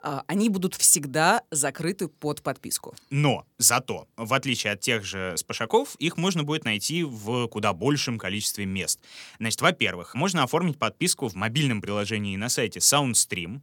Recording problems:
none

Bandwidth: 18 kHz